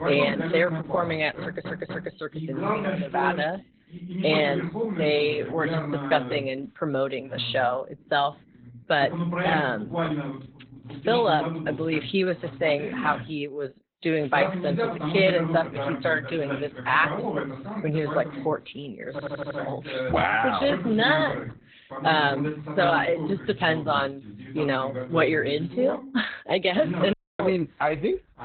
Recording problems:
garbled, watery; badly; nothing above 4 kHz
voice in the background; loud; throughout; 6 dB below the speech
audio stuttering; at 1.5 s and at 19 s
audio cutting out; at 27 s

